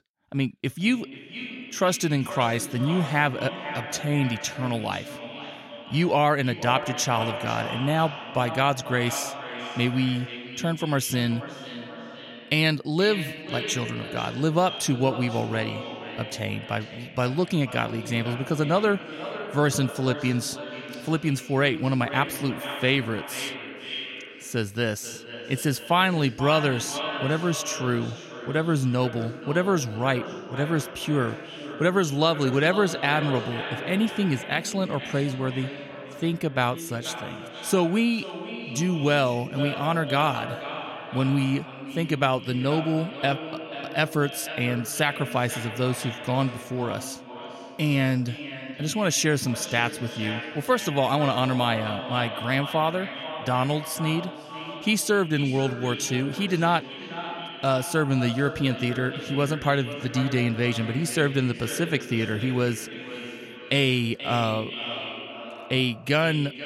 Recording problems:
echo of what is said; strong; throughout; 480 ms later, 10 dB below the speech

